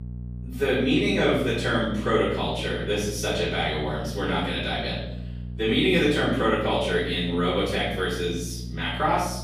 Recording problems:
off-mic speech; far
room echo; noticeable; dies away in 0.8 s
electrical hum; faint; throughout; 60 Hz, 25 dB below the speech

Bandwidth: 15 kHz